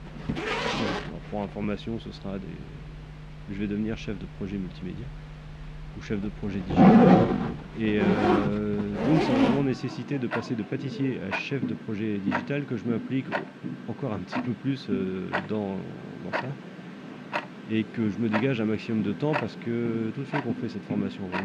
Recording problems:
muffled; slightly; fading above 2.5 kHz
household noises; very loud; throughout; 3 dB above the speech
abrupt cut into speech; at the end

